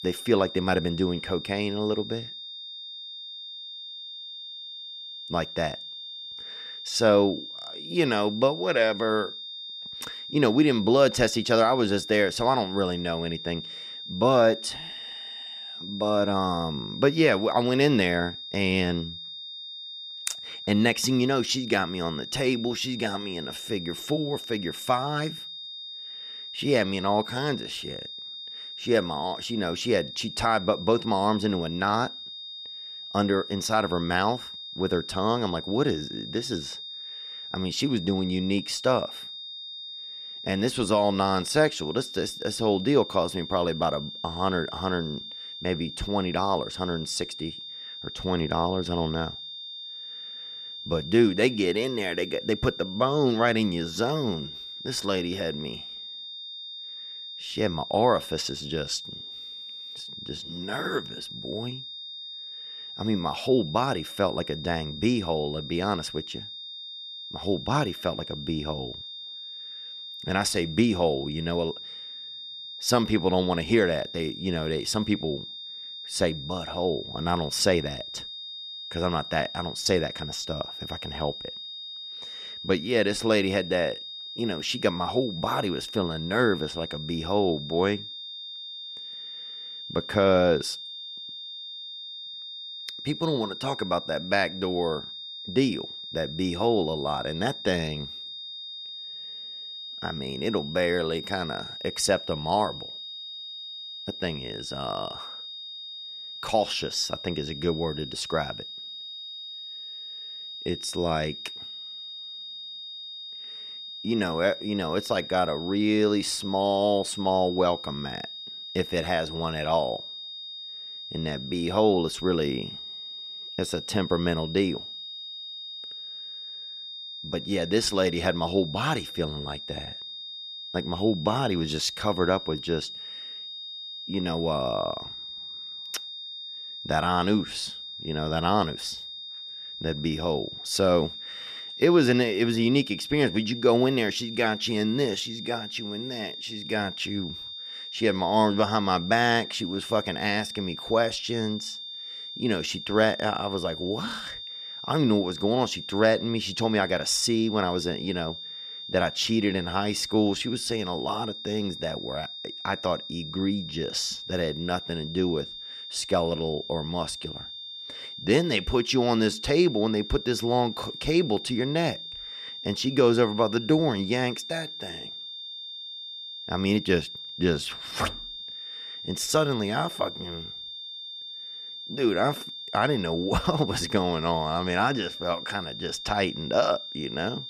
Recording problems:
high-pitched whine; loud; throughout; 3.5 kHz, 10 dB below the speech

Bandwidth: 14.5 kHz